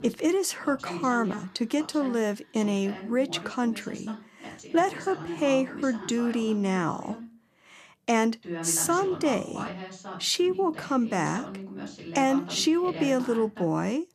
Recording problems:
voice in the background; noticeable; throughout; 15 dB below the speech

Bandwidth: 14 kHz